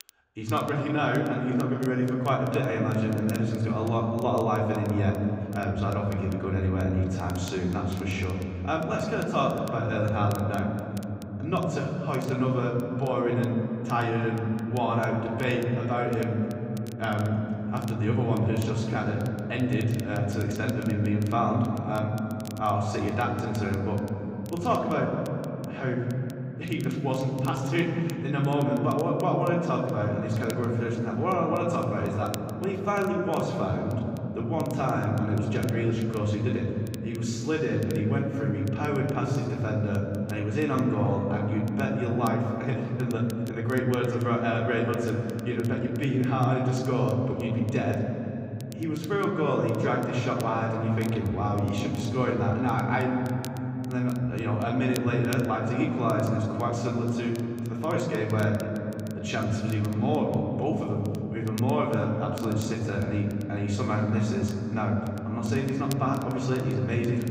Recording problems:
off-mic speech; far
room echo; noticeable; dies away in 3 s
crackle, like an old record; very faint; 25 dB below the speech

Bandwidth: 15.5 kHz